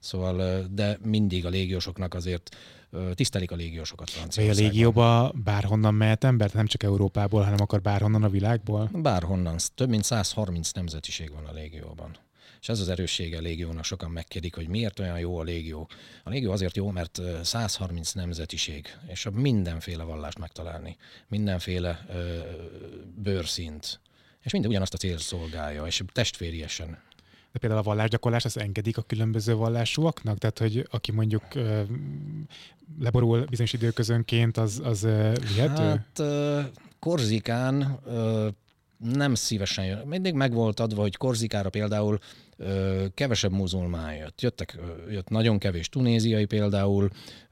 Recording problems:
uneven, jittery; strongly; from 1 to 45 s

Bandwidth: 16 kHz